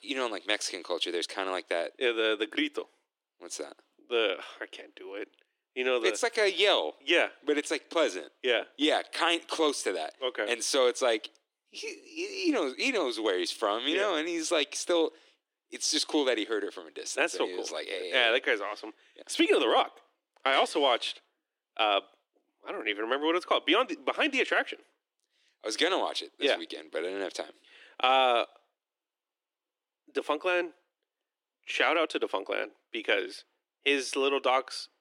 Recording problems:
thin; very; fading below 300 Hz

